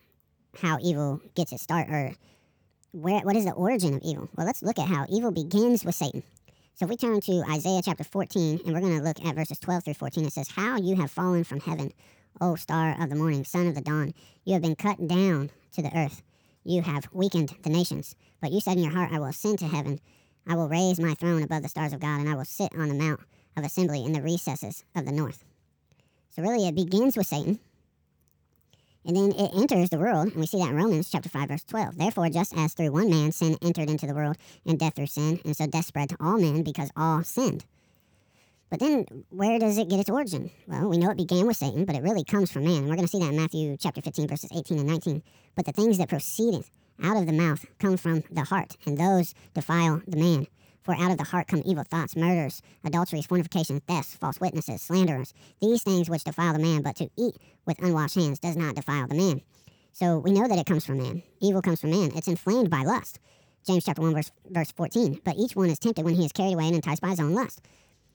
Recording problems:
wrong speed and pitch; too fast and too high; 1.6 times normal speed

